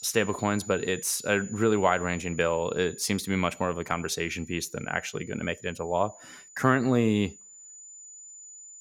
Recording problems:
high-pitched whine; noticeable; throughout; 7 kHz, 20 dB below the speech

